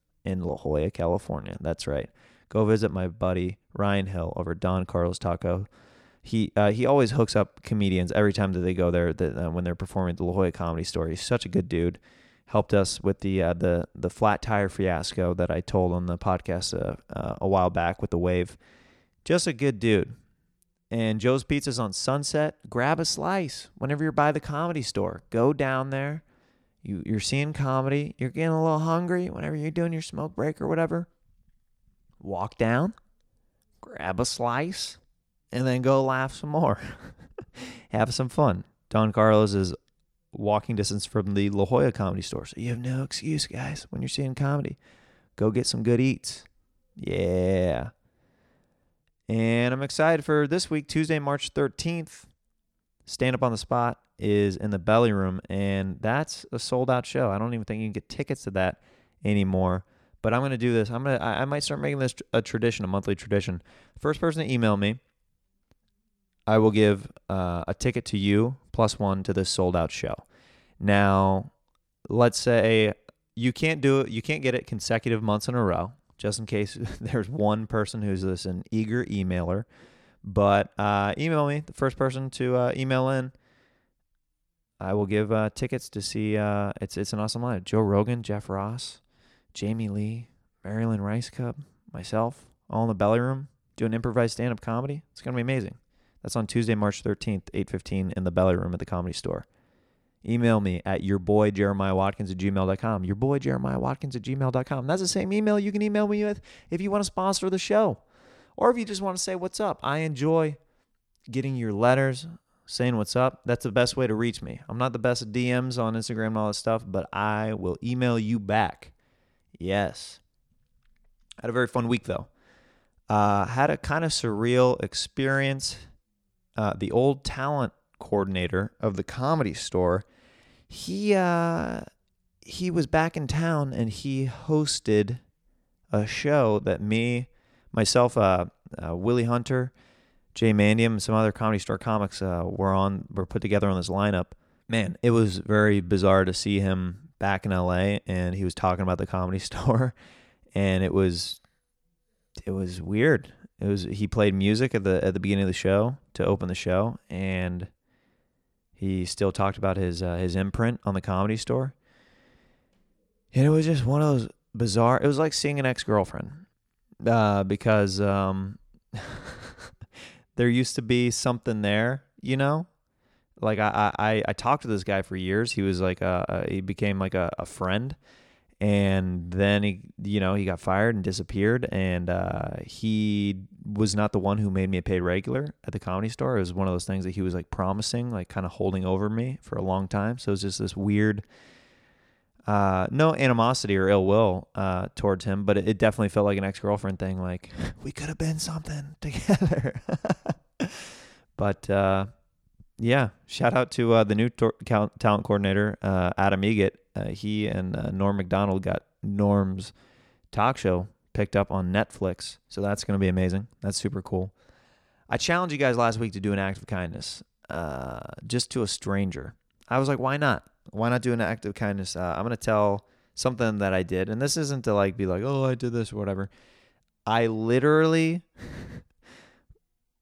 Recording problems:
none

